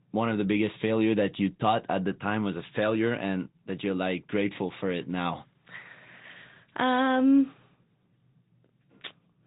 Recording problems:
high frequencies cut off; severe; nothing above 4 kHz
garbled, watery; slightly

